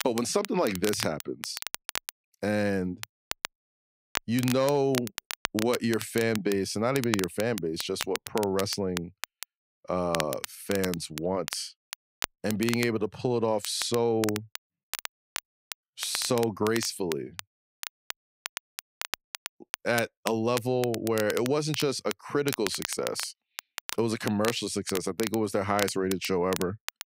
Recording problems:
crackle, like an old record; loud; 9 dB below the speech

